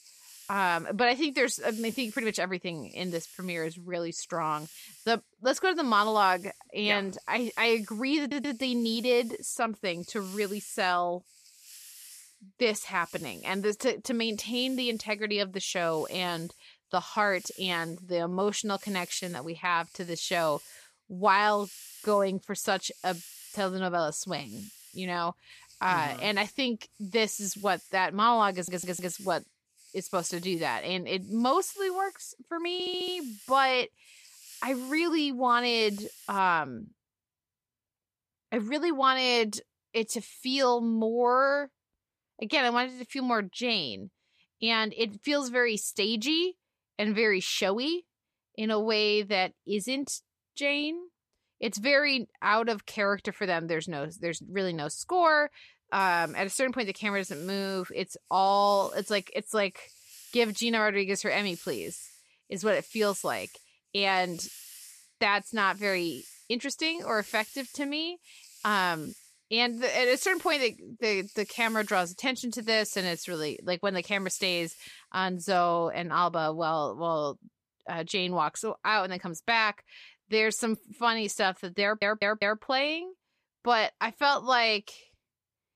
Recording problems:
hiss; noticeable; until 36 s and from 56 s to 1:16; 20 dB below the speech
audio stuttering; 4 times, first at 8 s

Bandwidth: 14.5 kHz